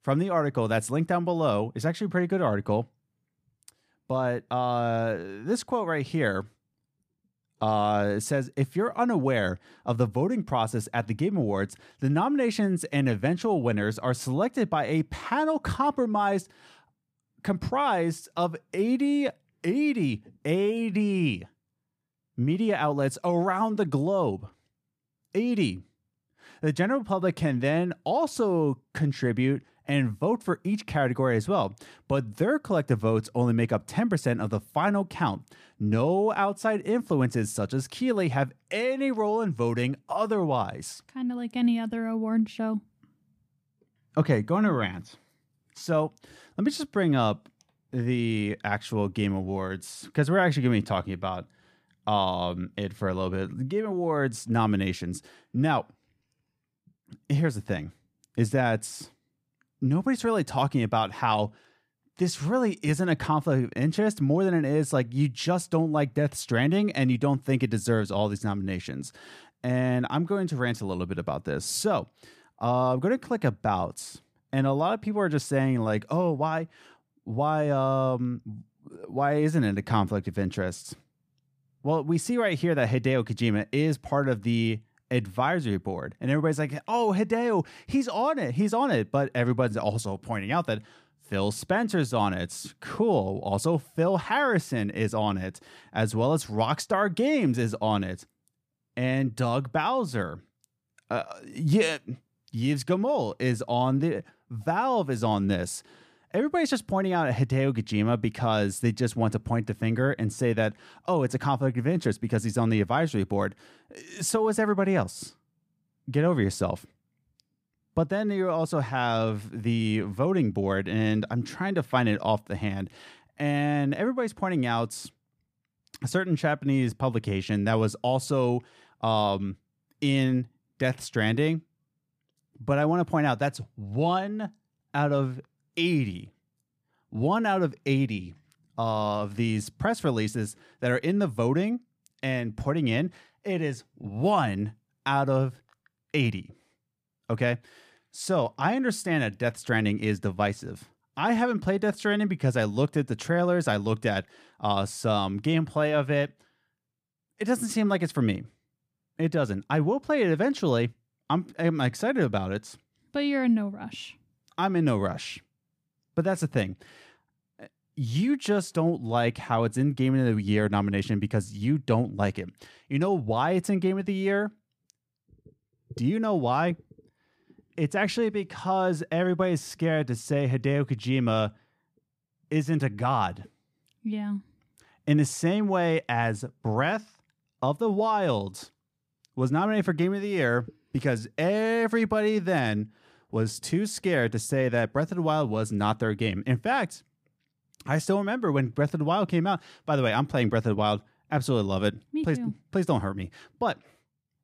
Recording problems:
none

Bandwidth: 15 kHz